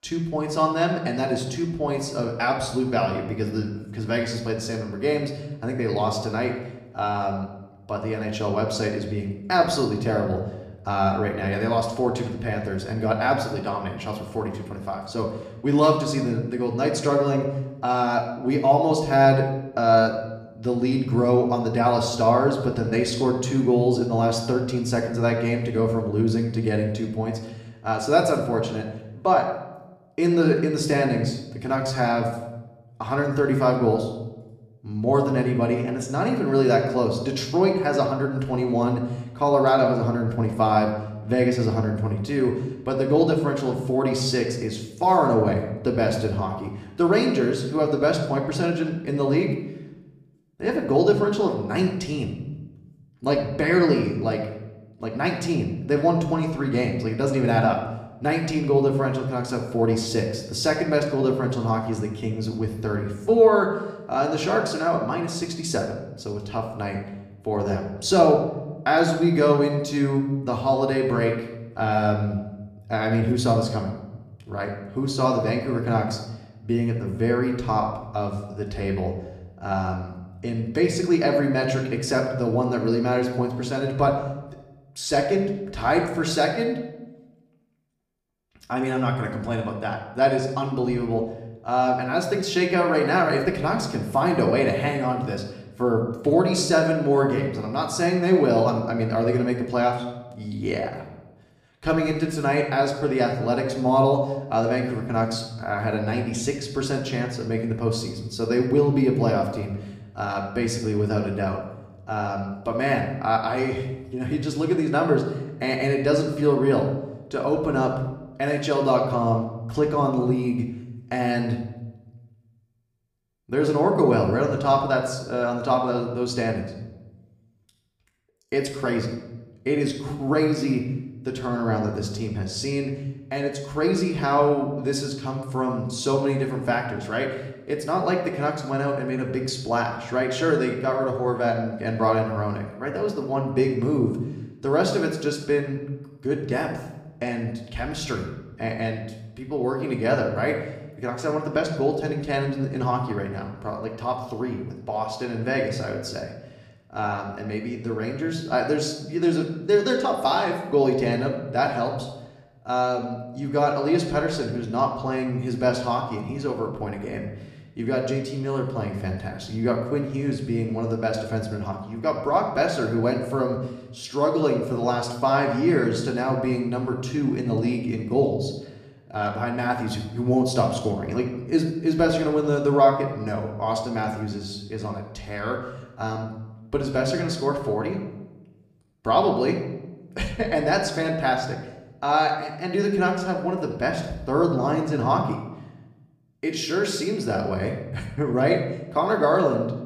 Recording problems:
room echo; slight; dies away in 0.8 s
off-mic speech; somewhat distant

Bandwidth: 15 kHz